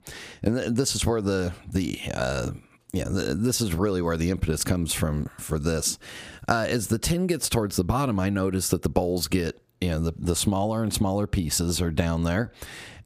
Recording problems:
squashed, flat; somewhat

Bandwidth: 15 kHz